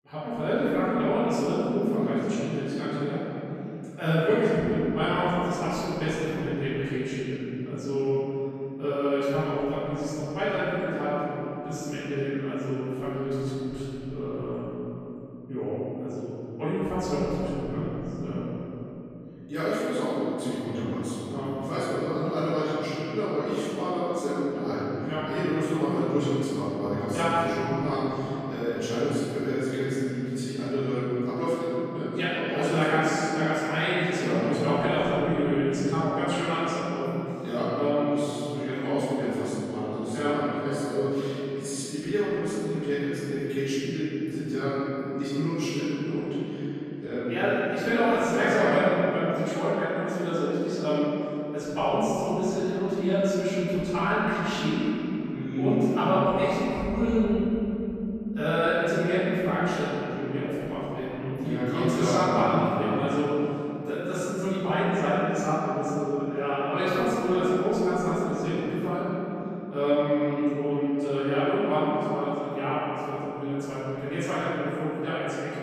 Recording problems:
room echo; strong; dies away in 3 s
off-mic speech; far

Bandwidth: 14.5 kHz